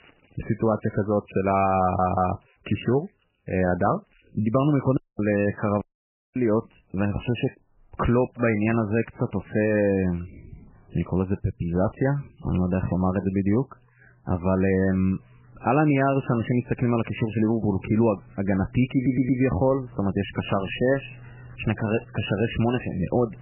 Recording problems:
garbled, watery; badly; nothing above 3 kHz
household noises; faint; throughout; 25 dB below the speech
audio stuttering; at 2 s and at 19 s
audio cutting out; at 5 s and at 6 s for 0.5 s

